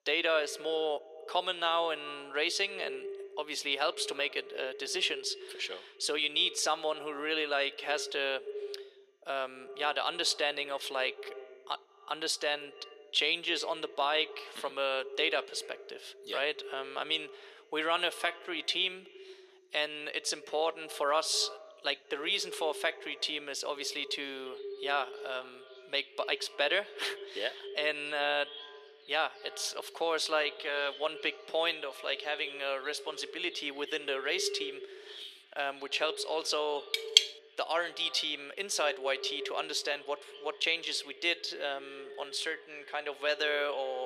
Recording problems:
thin; very; fading below 400 Hz
echo of what is said; noticeable; throughout; 90 ms later, 15 dB below the speech
animal sounds; noticeable; throughout; 20 dB below the speech
clattering dishes; loud; at 37 s; peak 9 dB above the speech
abrupt cut into speech; at the end

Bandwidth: 14.5 kHz